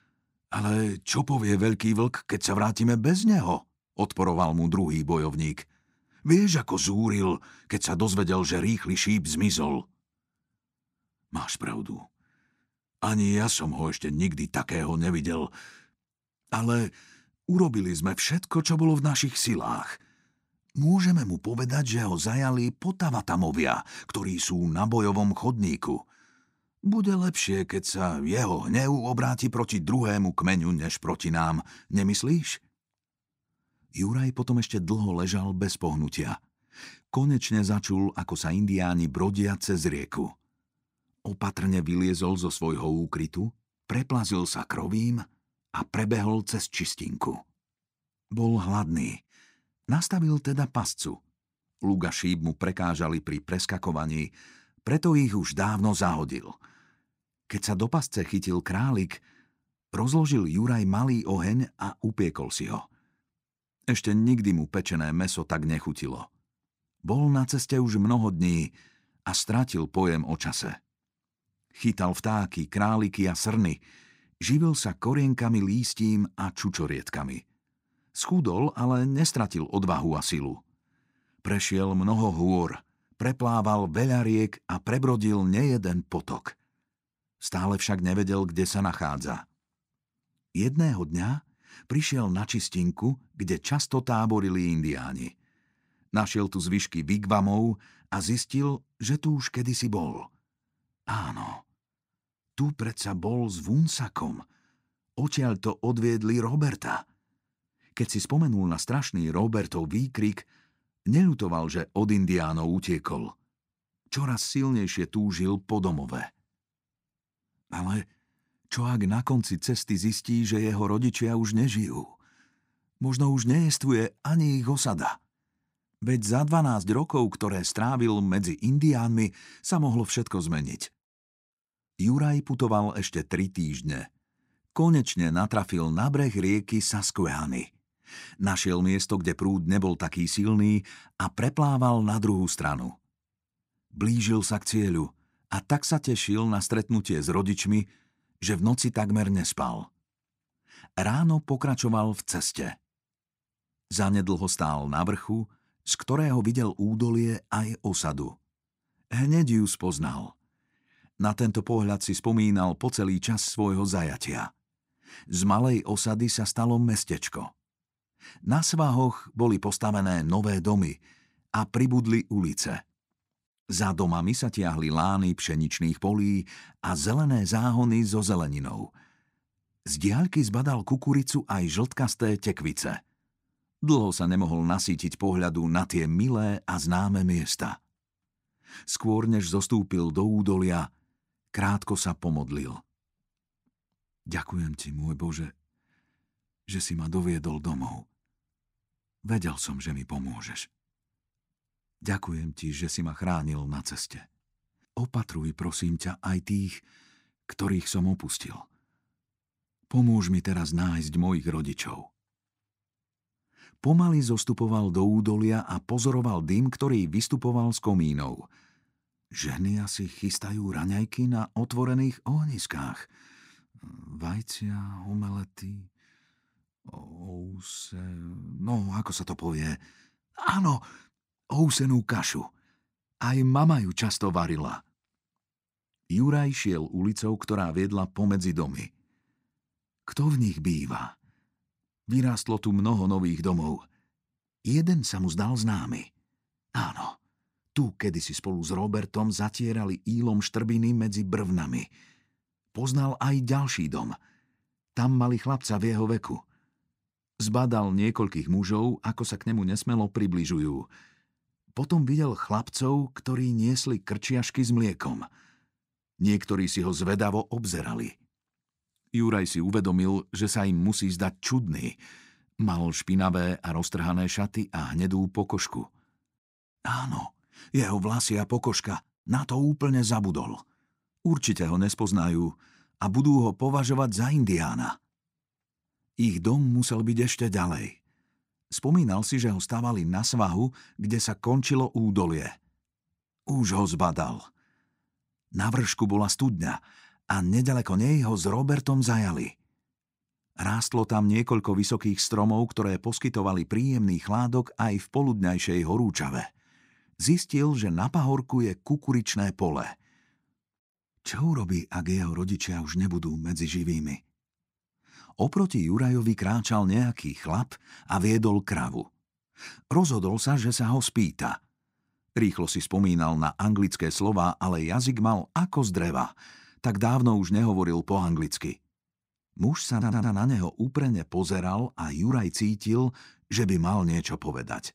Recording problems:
audio stuttering; at 5:30

